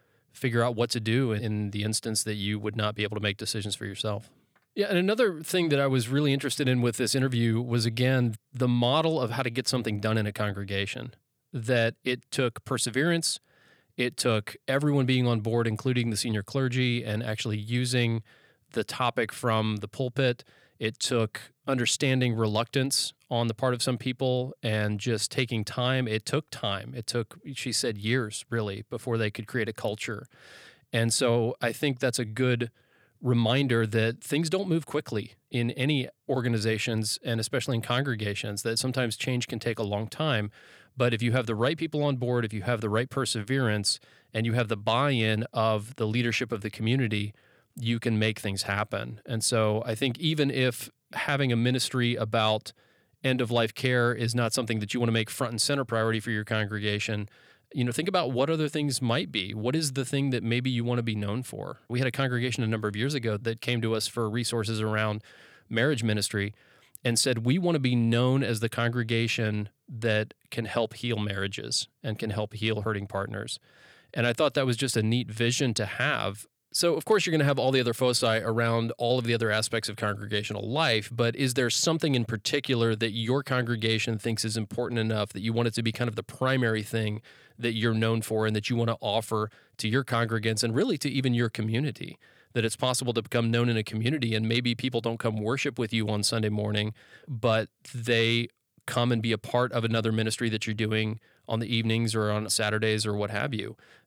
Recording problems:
none

